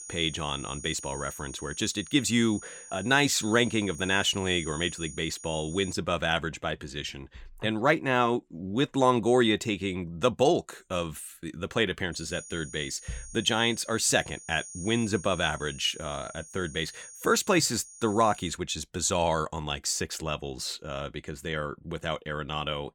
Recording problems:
high-pitched whine; noticeable; until 6 s and from 12 to 19 s; 6.5 kHz, 15 dB below the speech

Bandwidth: 17.5 kHz